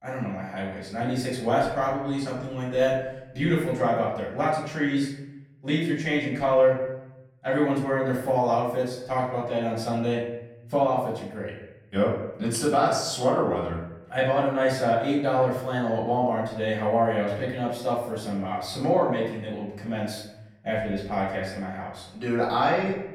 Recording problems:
off-mic speech; far
room echo; noticeable; dies away in 0.8 s

